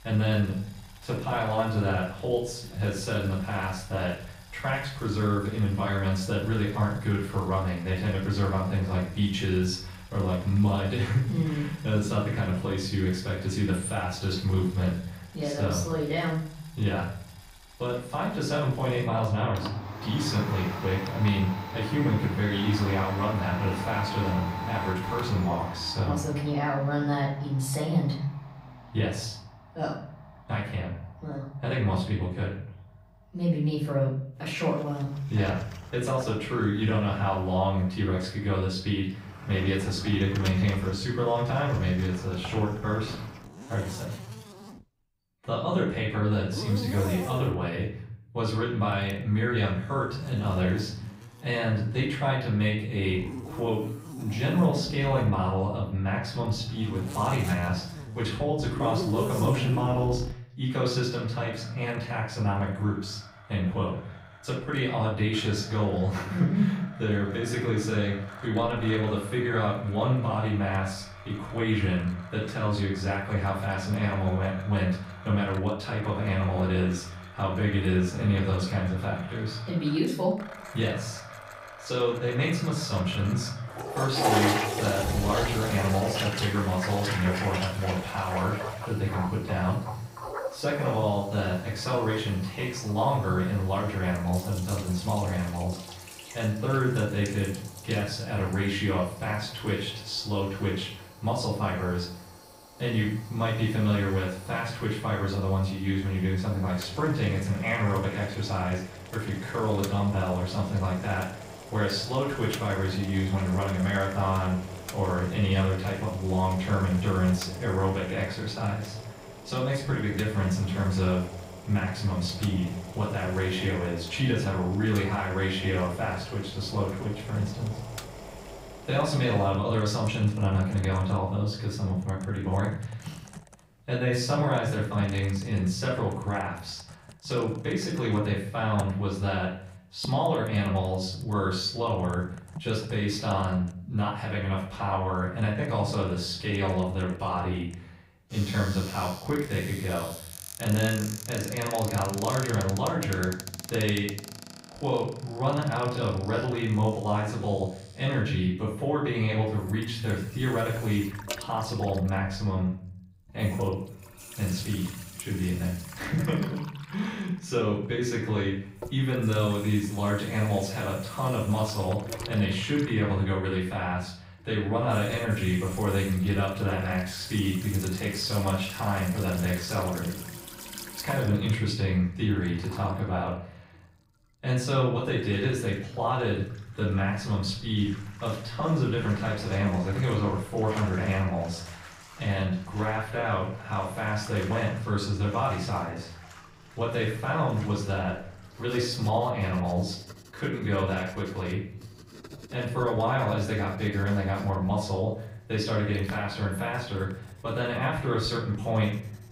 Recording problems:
off-mic speech; far
room echo; noticeable; dies away in 0.6 s
household noises; noticeable; throughout; 10 dB below the speech

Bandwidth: 15.5 kHz